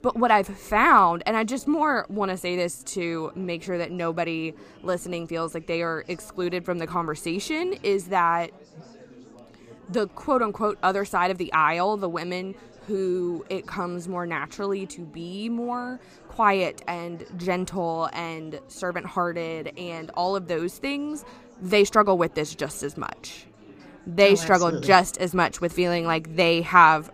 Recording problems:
chatter from many people; faint; throughout; 25 dB below the speech

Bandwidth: 15 kHz